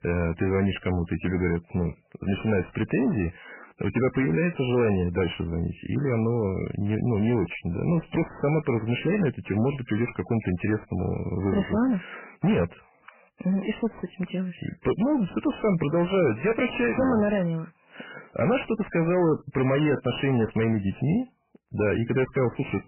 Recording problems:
garbled, watery; badly; nothing above 3 kHz
distortion; slight; 10 dB below the speech

